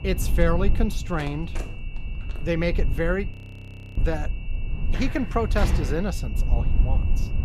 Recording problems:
high-pitched whine; noticeable; throughout; 2.5 kHz, 20 dB below the speech
low rumble; noticeable; throughout; 15 dB below the speech
phone ringing; faint; from 1 to 2.5 s; peak 15 dB below the speech
audio freezing; at 3.5 s for 0.5 s
footsteps; loud; from 5 to 6 s; peak 1 dB above the speech

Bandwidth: 14.5 kHz